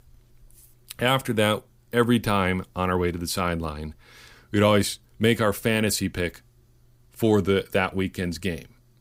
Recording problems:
none

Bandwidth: 15.5 kHz